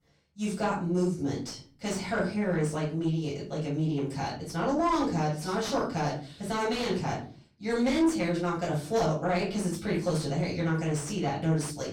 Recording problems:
off-mic speech; far
room echo; slight; dies away in 0.4 s
distortion; slight; 10 dB below the speech

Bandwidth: 17 kHz